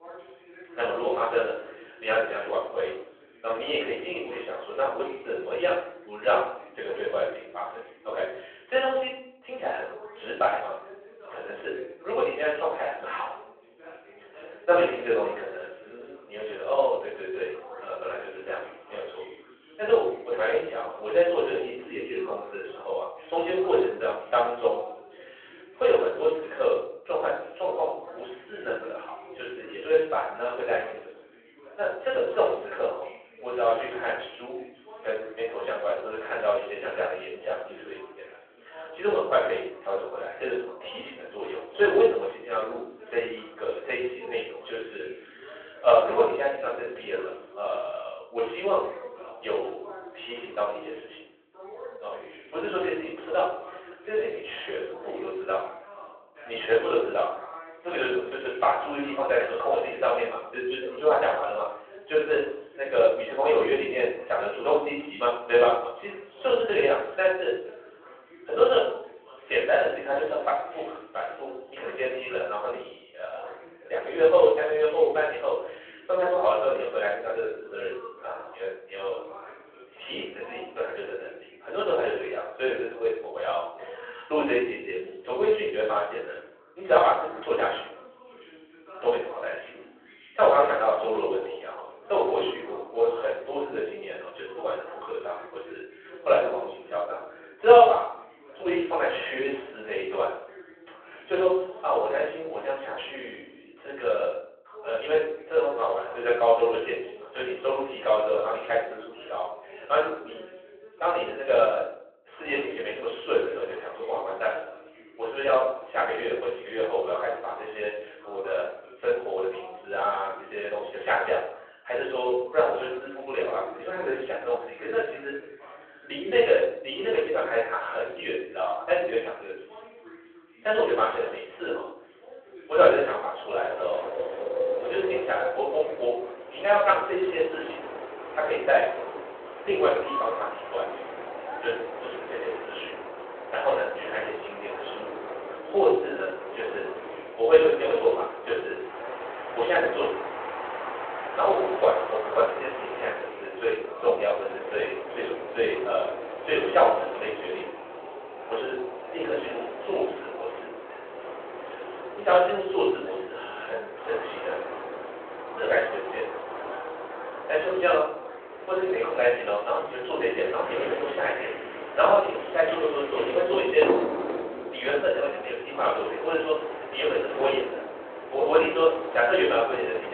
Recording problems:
off-mic speech; far
room echo; noticeable; dies away in 0.6 s
phone-call audio
wind in the background; loud; from 2:14 on; 9 dB below the speech
voice in the background; noticeable; throughout; 20 dB below the speech
abrupt cut into speech; at the end

